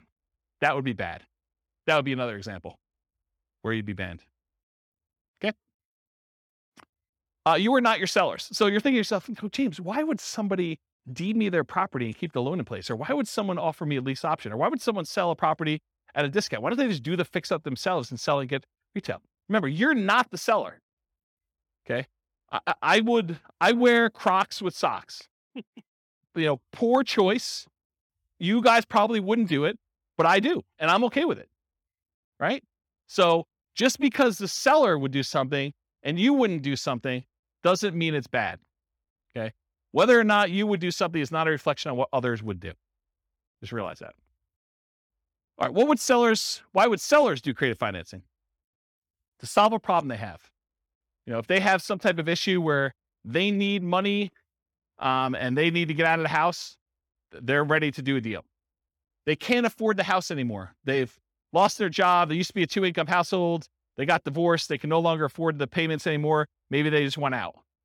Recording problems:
none

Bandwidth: 18 kHz